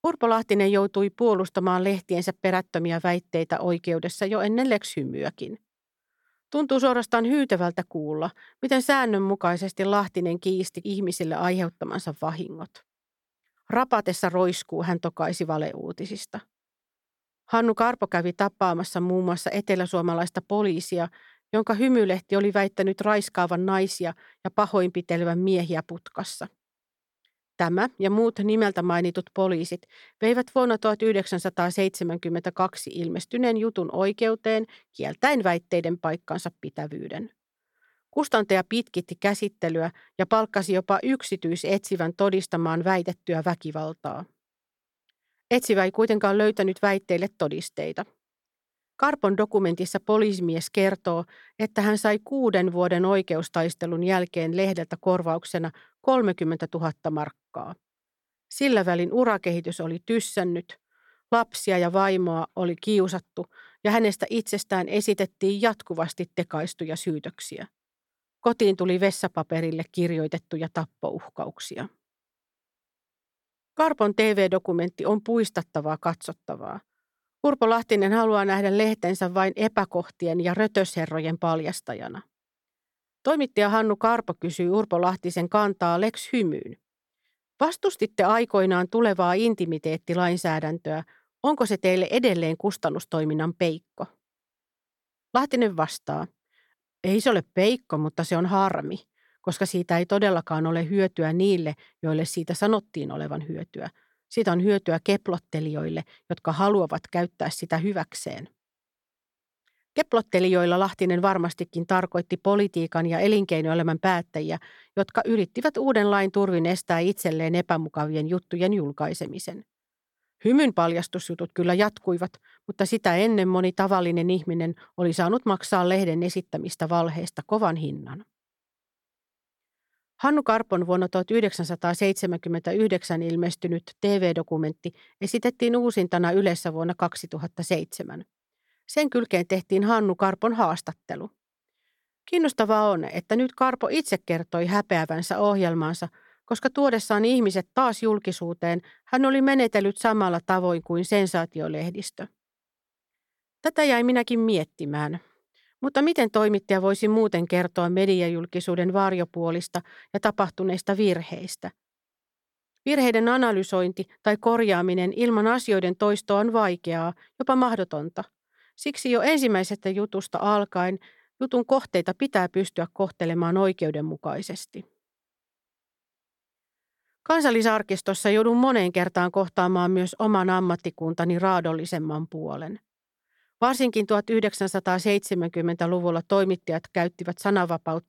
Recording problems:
none

